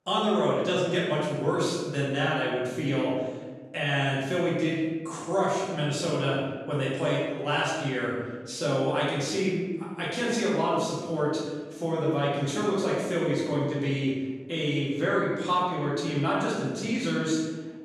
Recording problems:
room echo; strong; dies away in 1.2 s
off-mic speech; far

